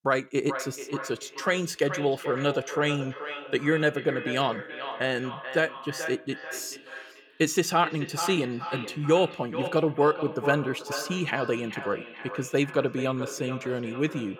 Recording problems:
echo of what is said; strong; throughout; 430 ms later, 9 dB below the speech

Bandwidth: 18.5 kHz